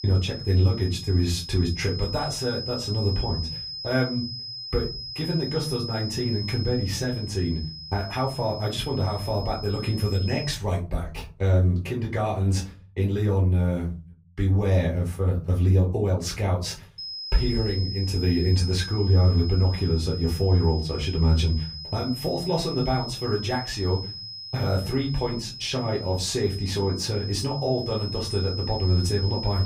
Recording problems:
off-mic speech; far
room echo; slight; dies away in 0.4 s
high-pitched whine; loud; until 11 s and from 17 s on; 5 kHz, 9 dB below the speech

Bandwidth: 15.5 kHz